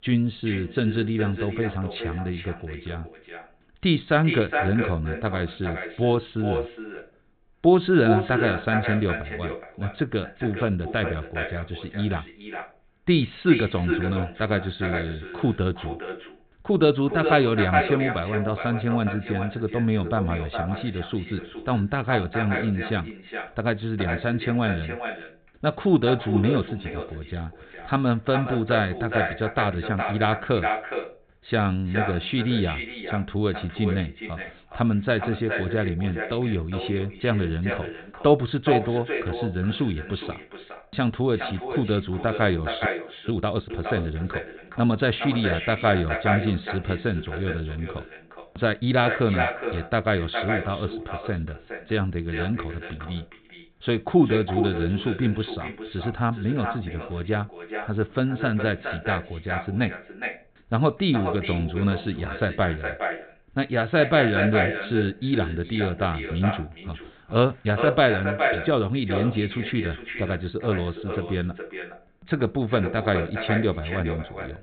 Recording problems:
echo of what is said; strong; throughout; 420 ms later, 6 dB below the speech
high frequencies cut off; severe; nothing above 4 kHz
audio freezing; at 43 s

